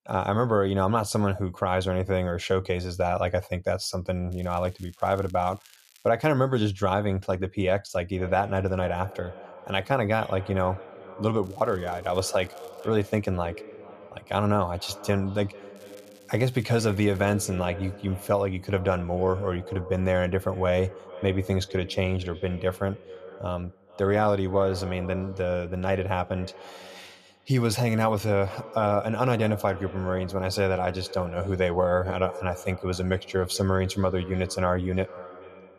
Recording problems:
echo of what is said; noticeable; from 8 s on; 440 ms later, 15 dB below the speech
crackling; faint; from 4.5 to 6 s, from 11 to 13 s and from 16 to 17 s; 30 dB below the speech

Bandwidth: 14.5 kHz